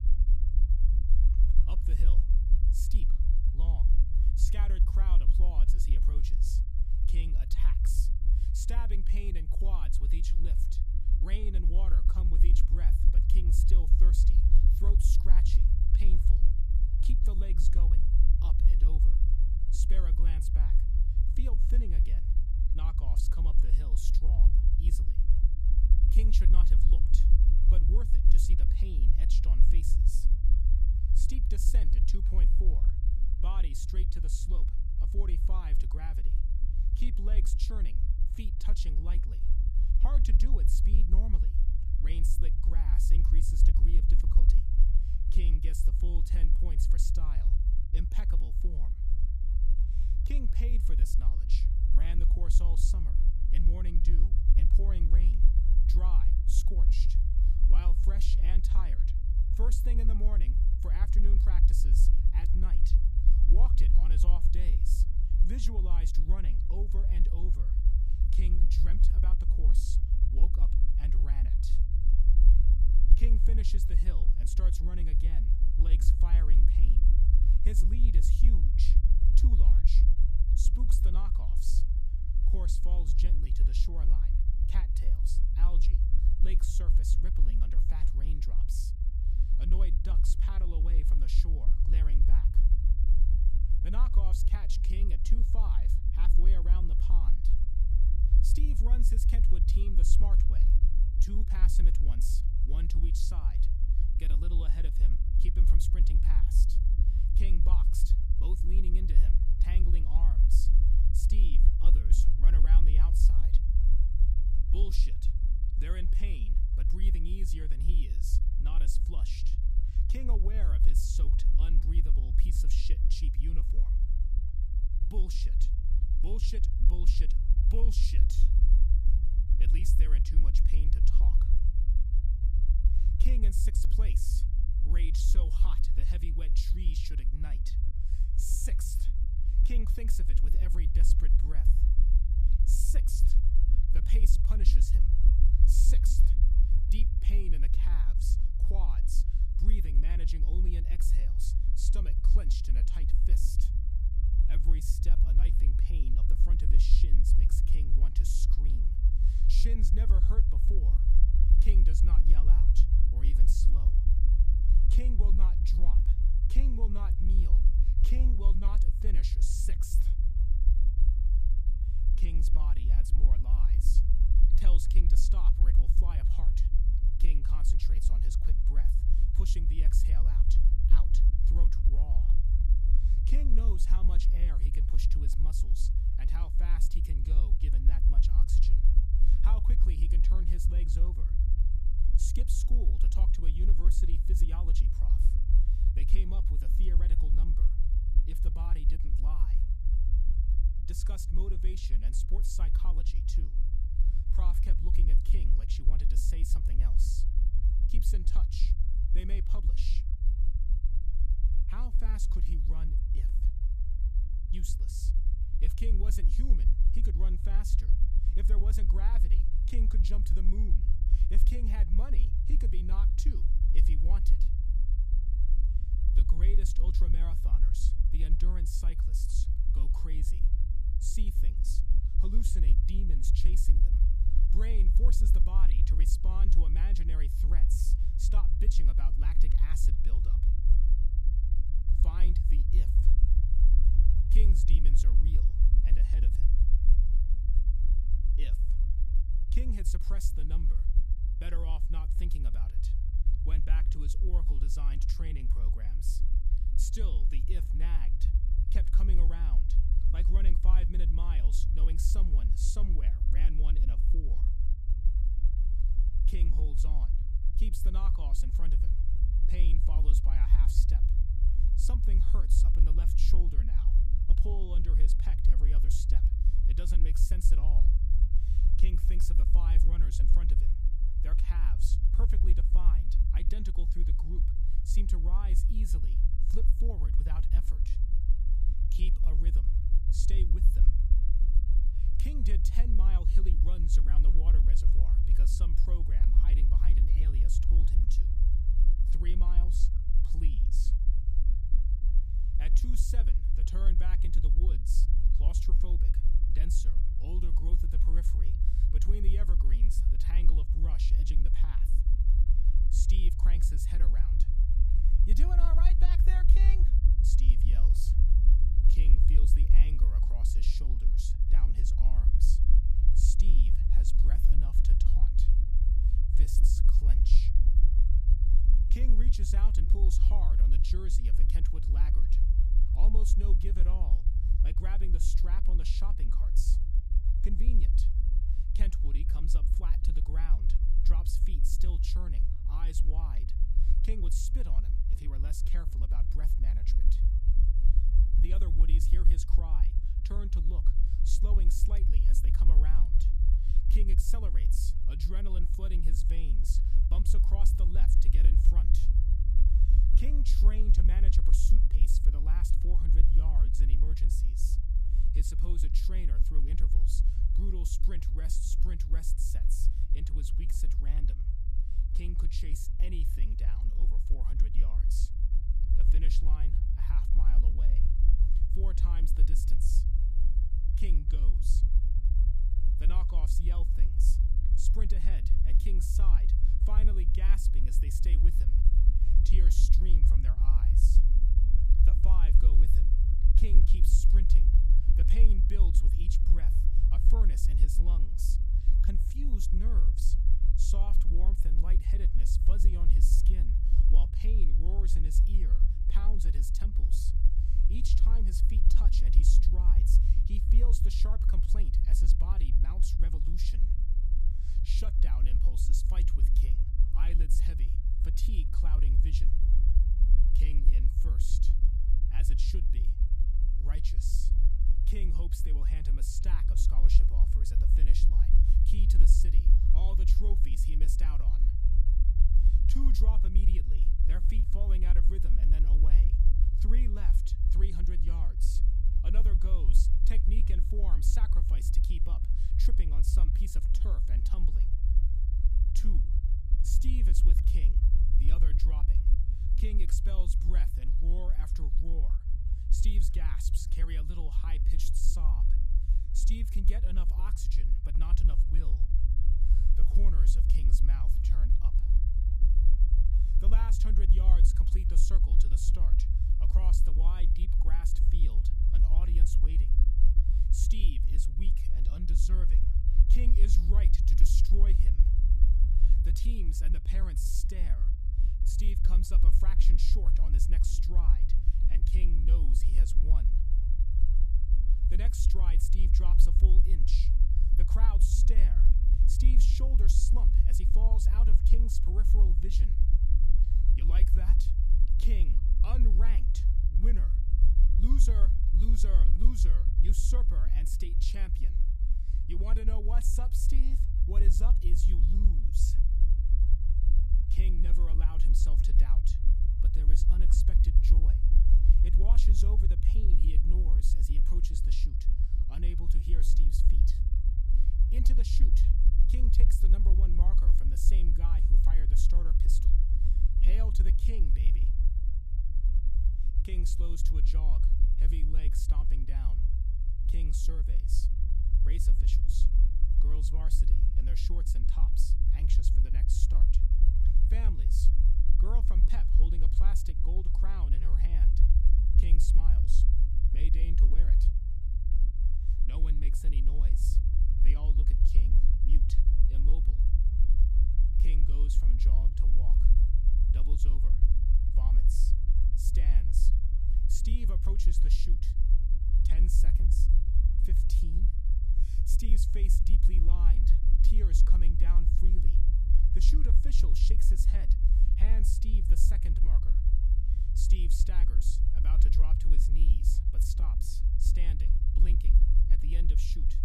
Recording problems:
low rumble; loud; throughout; 2 dB below the speech

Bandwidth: 14.5 kHz